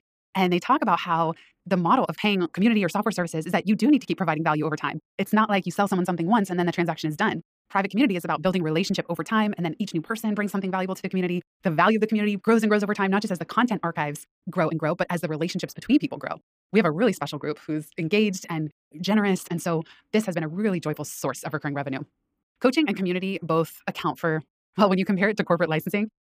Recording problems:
wrong speed, natural pitch; too fast; 1.6 times normal speed

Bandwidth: 15 kHz